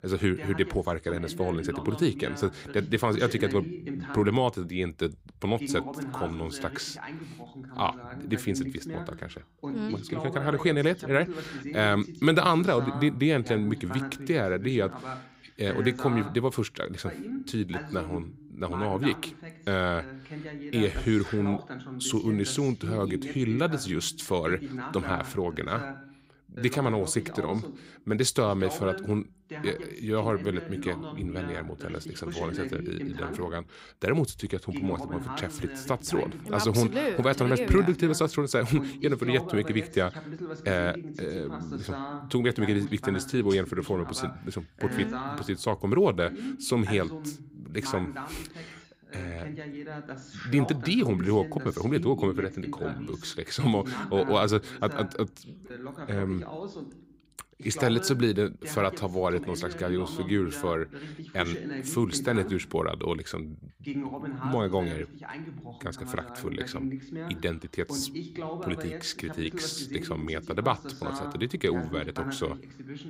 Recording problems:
voice in the background; loud; throughout; 10 dB below the speech

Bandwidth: 15.5 kHz